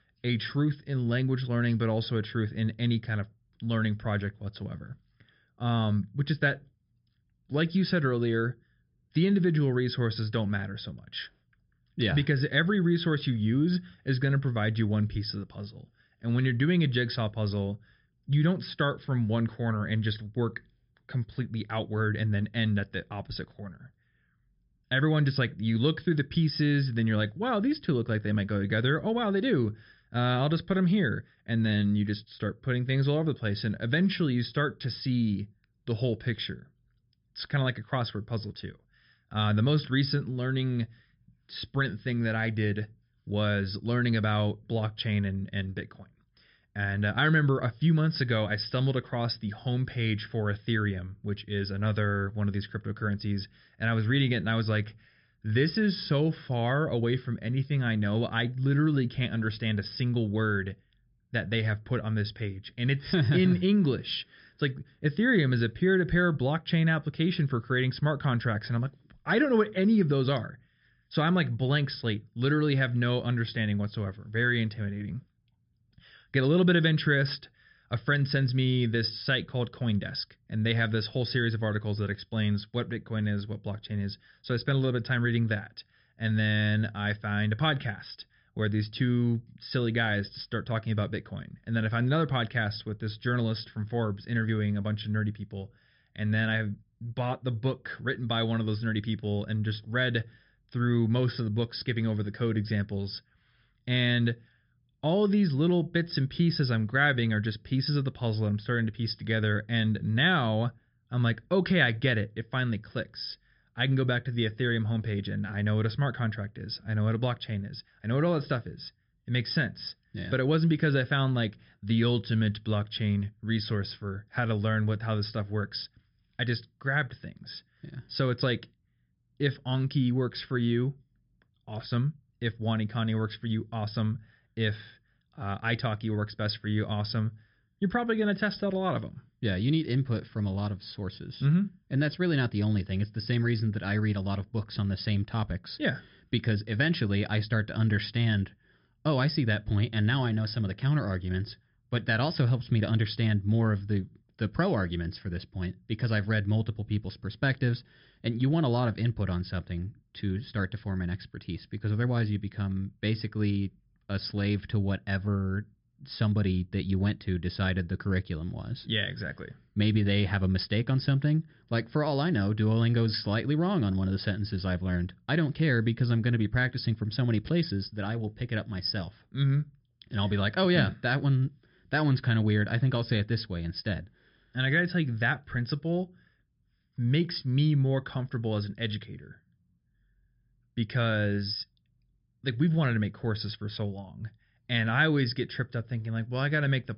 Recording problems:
high frequencies cut off; noticeable; nothing above 5.5 kHz

